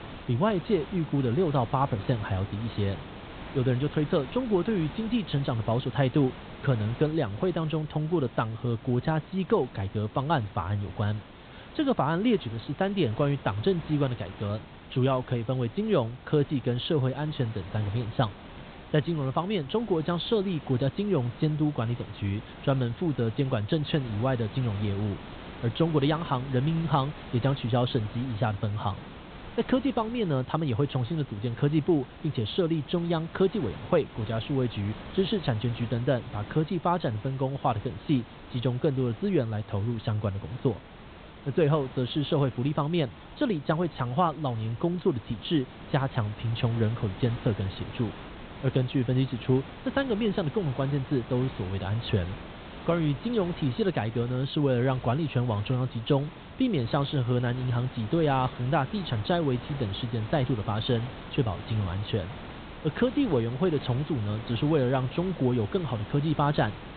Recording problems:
high frequencies cut off; severe; nothing above 4 kHz
hiss; noticeable; throughout; 15 dB below the speech

